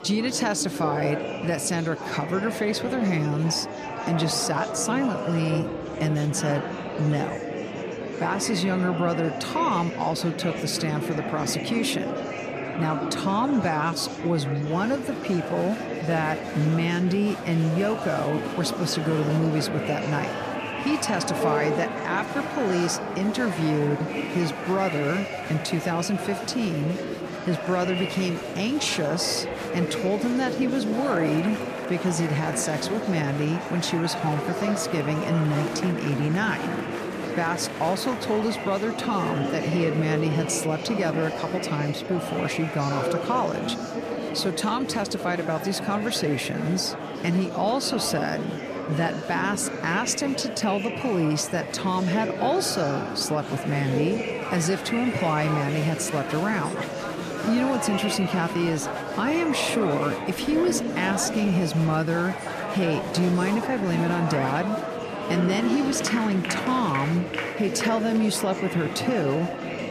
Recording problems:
murmuring crowd; loud; throughout; 4 dB below the speech

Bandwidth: 14.5 kHz